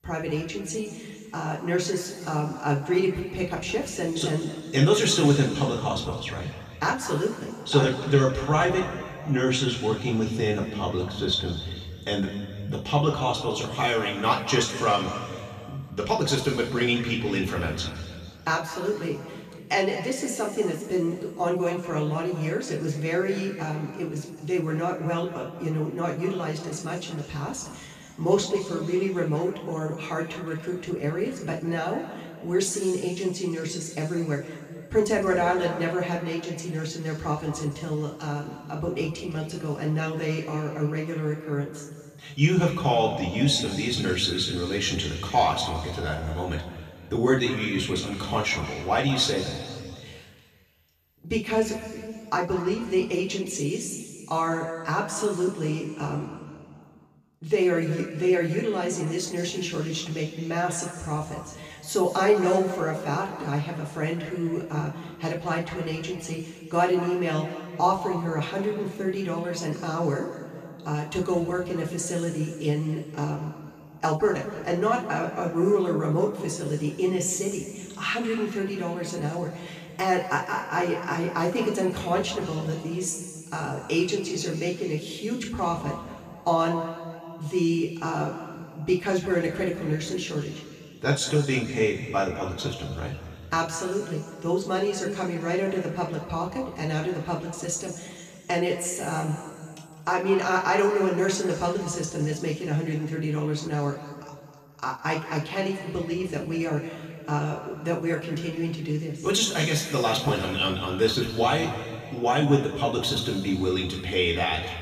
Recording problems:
off-mic speech; far
room echo; noticeable; dies away in 2.1 s

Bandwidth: 14.5 kHz